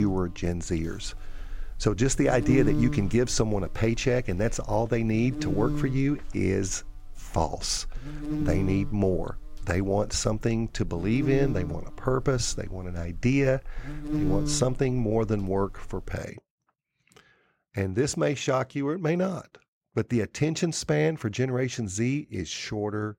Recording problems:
electrical hum; very faint; until 16 s; 60 Hz, 7 dB below the speech
abrupt cut into speech; at the start

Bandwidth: 16 kHz